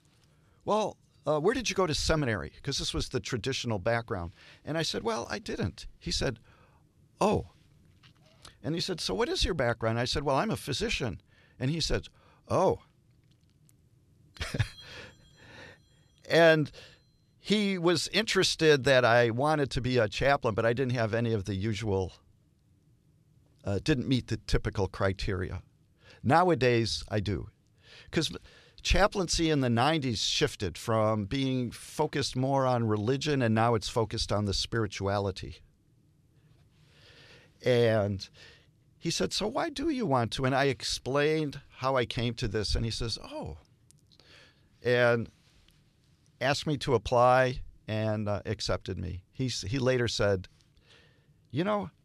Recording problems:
none

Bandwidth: 13.5 kHz